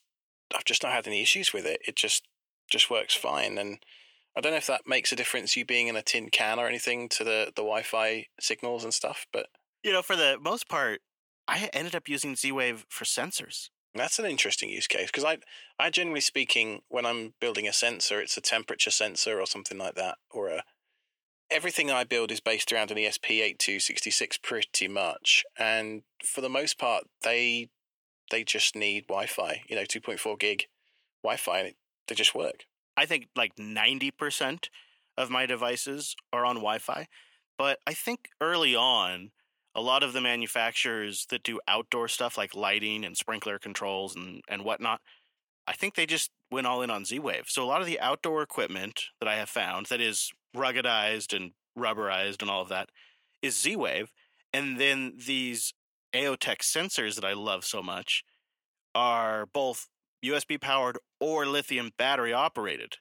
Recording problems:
thin; somewhat; fading below 400 Hz

